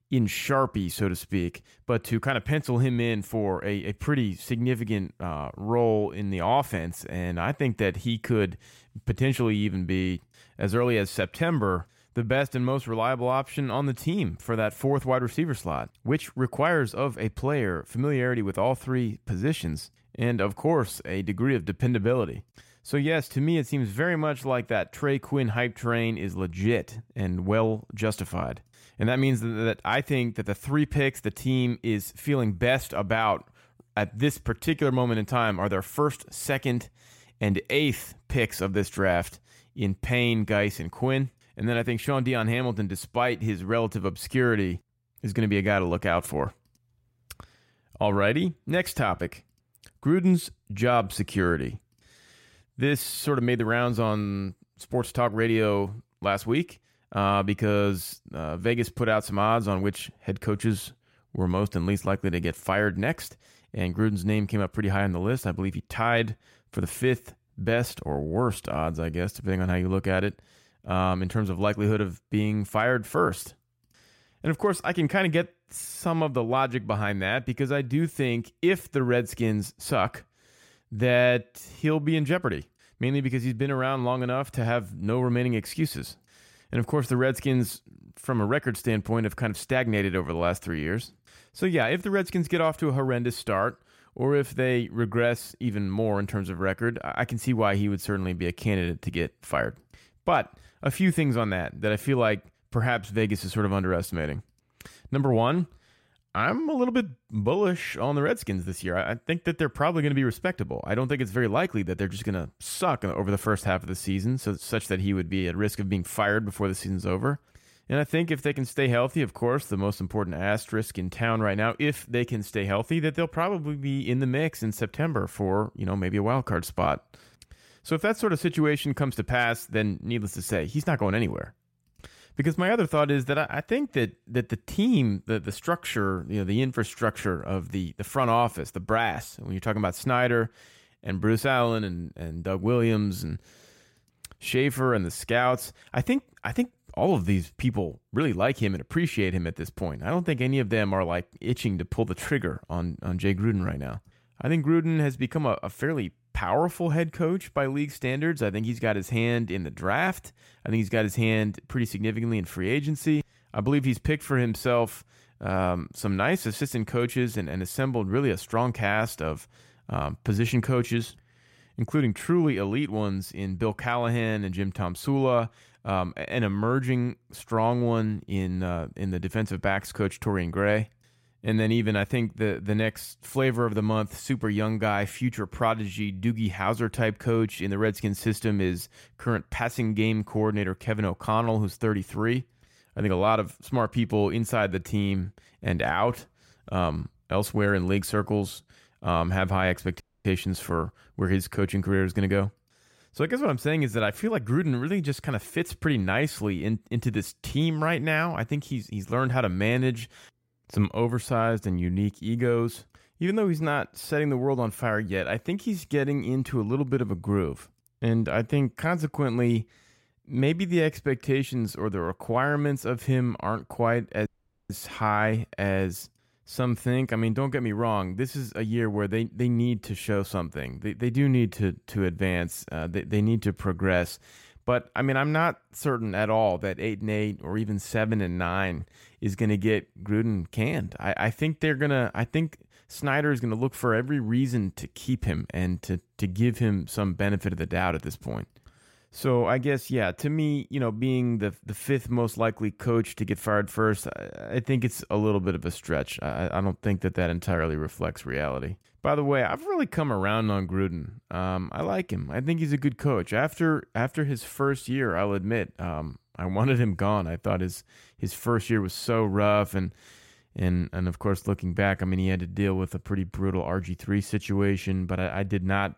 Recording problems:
audio cutting out; at 3:20 and at 3:44

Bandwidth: 16 kHz